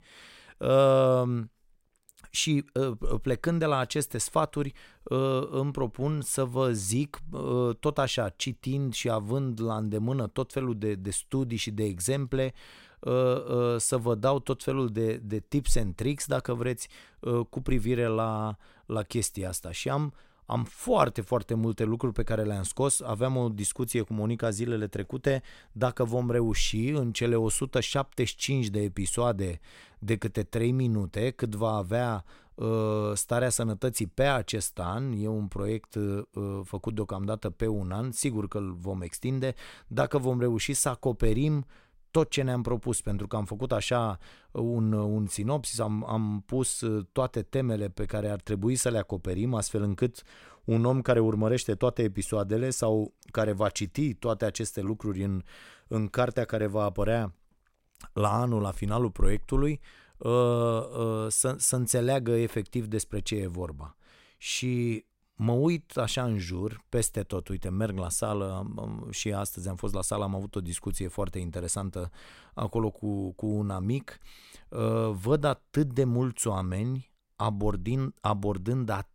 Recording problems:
none

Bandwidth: 16 kHz